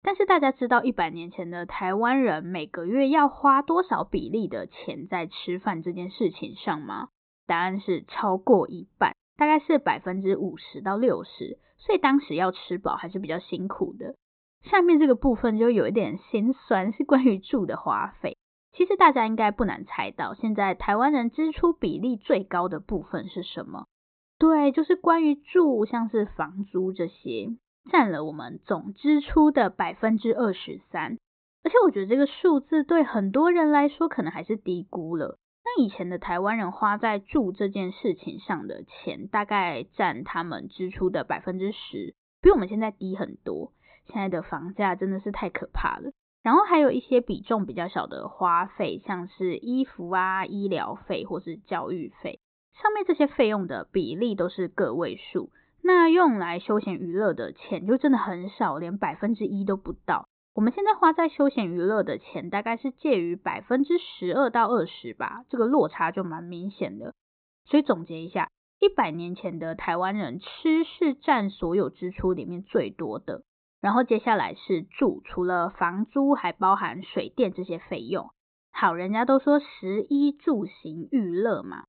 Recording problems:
high frequencies cut off; severe; nothing above 4 kHz

